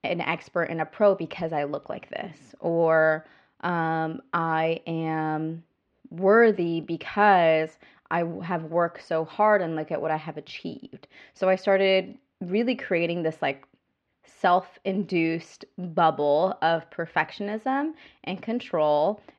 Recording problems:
muffled; slightly; fading above 3 kHz

